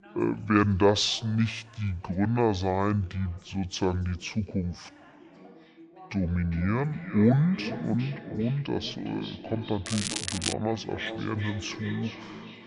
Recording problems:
wrong speed and pitch; too slow and too low; 0.7 times normal speed
echo of what is said; noticeable; from 5.5 s on; 410 ms later, 10 dB below the speech
crackling; loud; at 10 s; 4 dB below the speech
background chatter; faint; throughout; 2 voices, 25 dB below the speech

